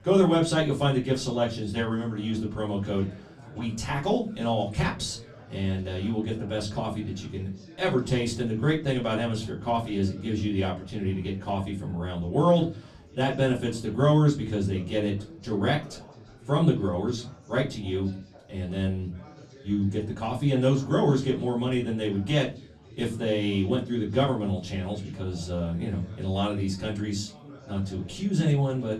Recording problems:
off-mic speech; far
room echo; very slight; dies away in 0.3 s
chatter from many people; faint; throughout; 20 dB below the speech

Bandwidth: 15.5 kHz